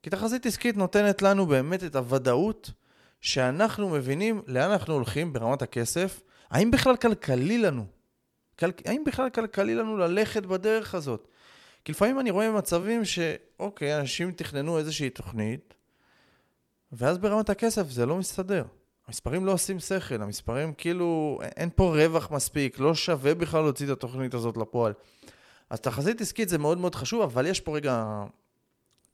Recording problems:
uneven, jittery; strongly; from 3 to 28 s

